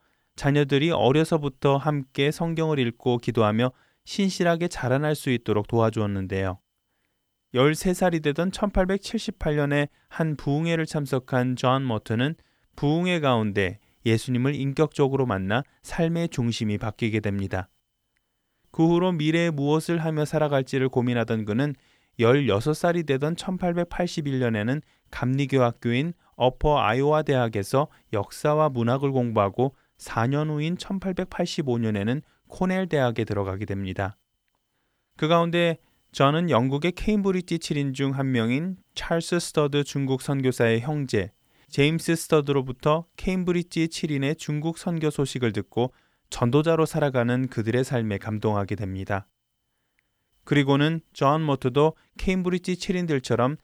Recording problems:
none

